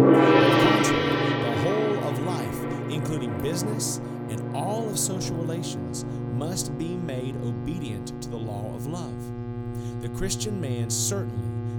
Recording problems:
background music; very loud; throughout; 5 dB above the speech
electrical hum; loud; throughout; 60 Hz, 7 dB below the speech
animal sounds; faint; throughout; 25 dB below the speech

